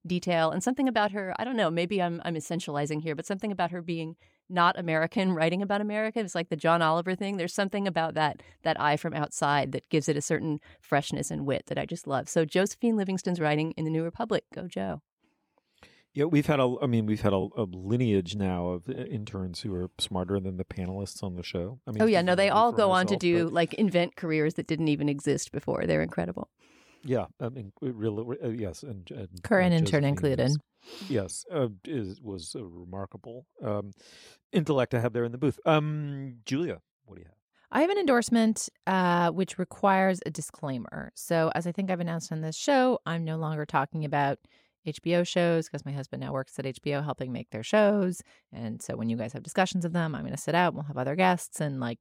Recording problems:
none

